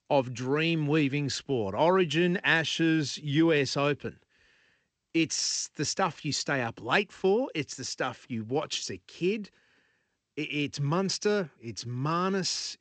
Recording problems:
garbled, watery; slightly; nothing above 7.5 kHz

